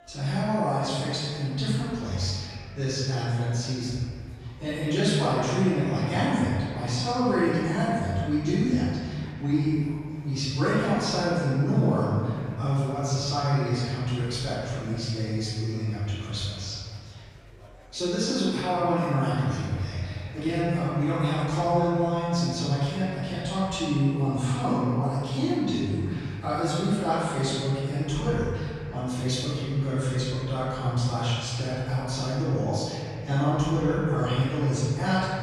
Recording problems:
room echo; strong; dies away in 2.2 s
off-mic speech; far
murmuring crowd; faint; throughout; 25 dB below the speech

